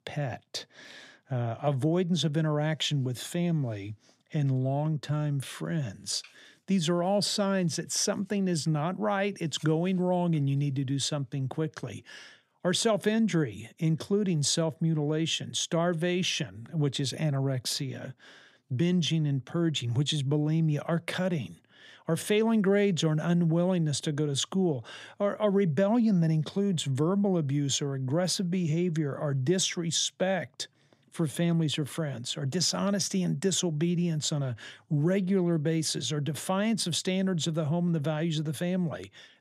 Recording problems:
none

